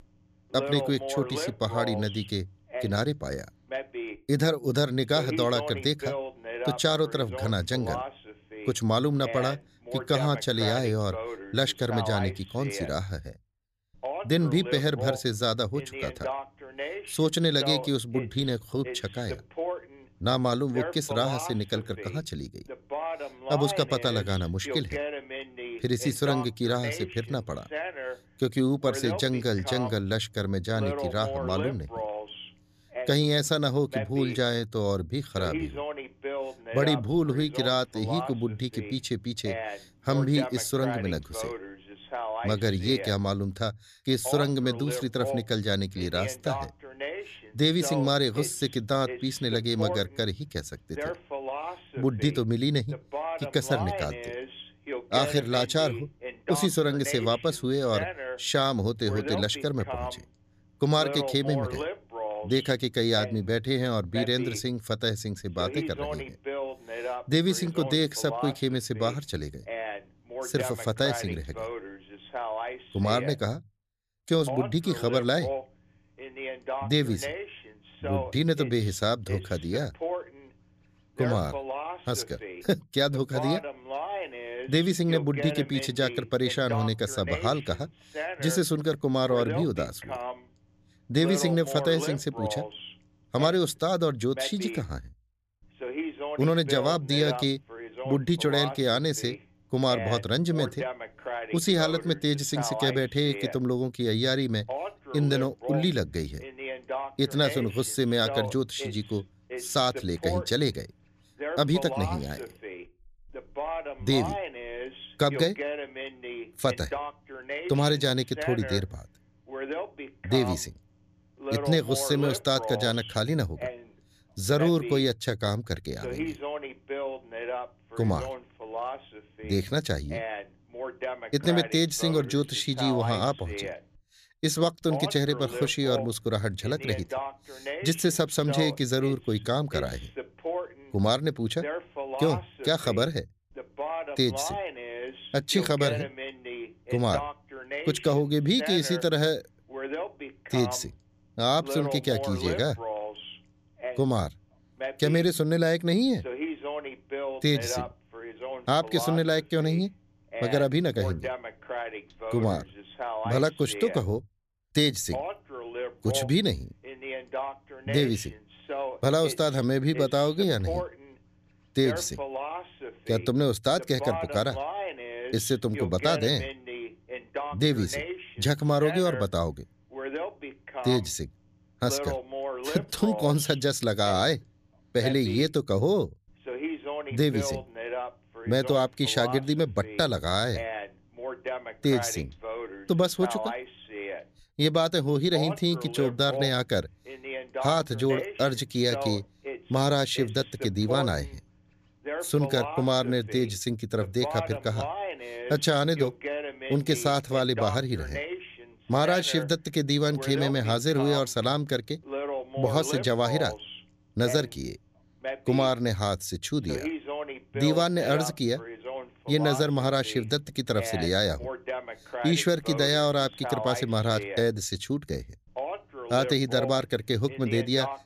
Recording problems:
voice in the background; loud; throughout; 9 dB below the speech

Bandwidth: 14.5 kHz